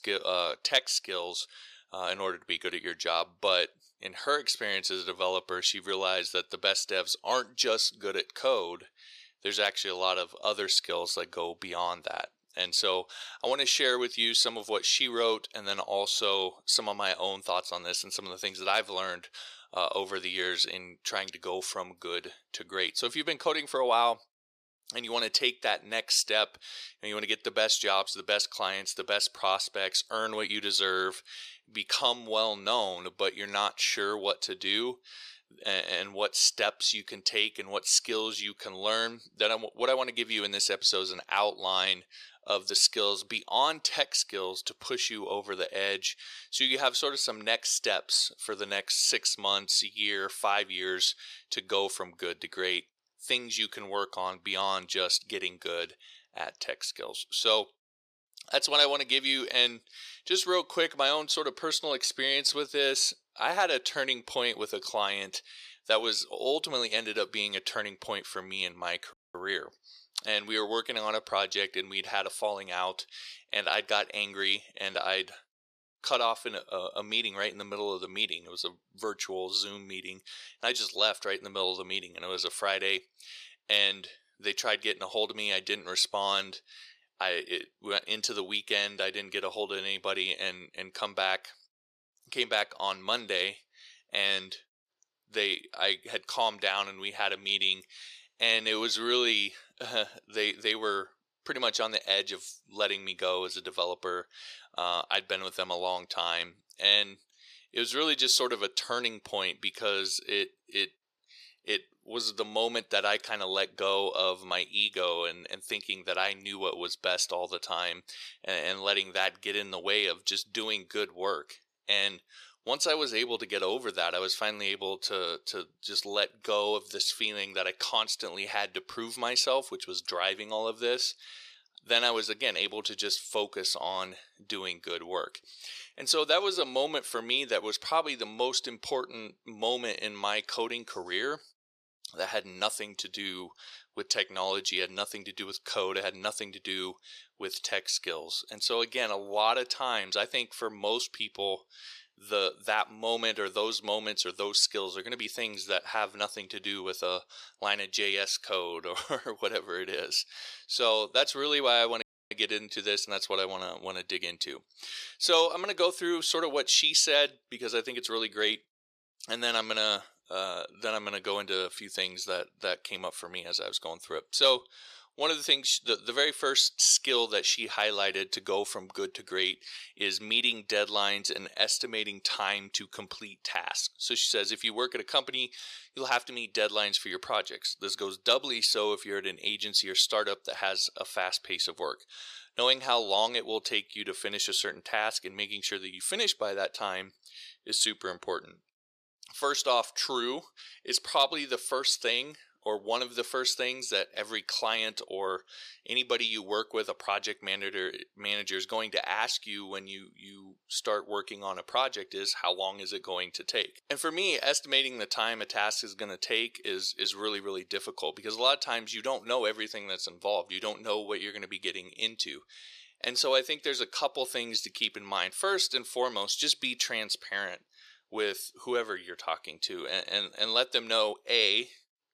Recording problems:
thin; somewhat; fading below 500 Hz
audio cutting out; at 1:09 and at 2:42

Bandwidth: 14.5 kHz